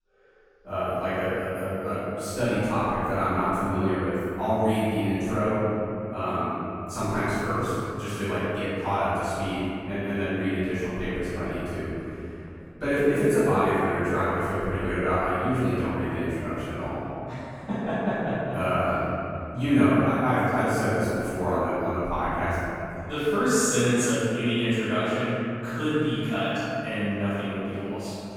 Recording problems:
room echo; strong; dies away in 2.9 s
off-mic speech; far

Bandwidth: 17 kHz